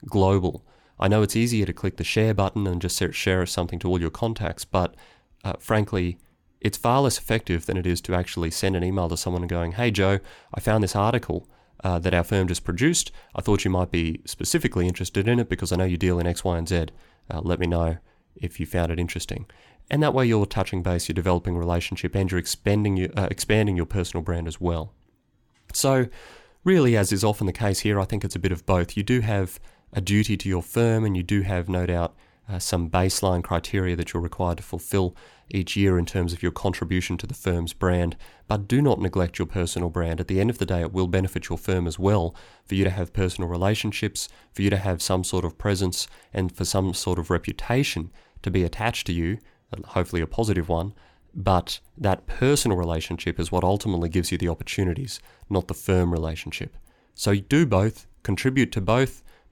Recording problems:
none

